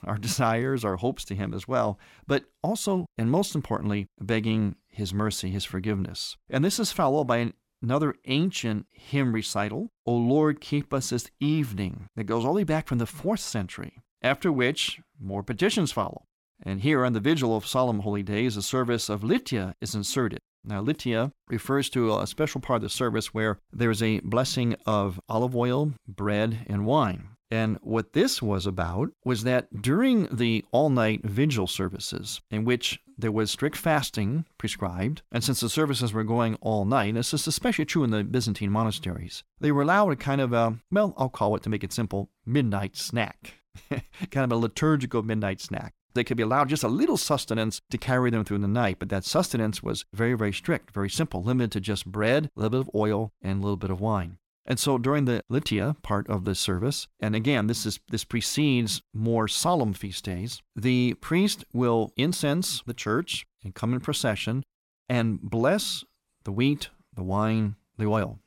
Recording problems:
none

